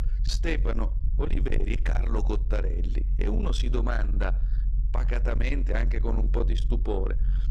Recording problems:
distortion; slight; 10 dB below the speech
low rumble; loud; throughout; 9 dB below the speech

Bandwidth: 14.5 kHz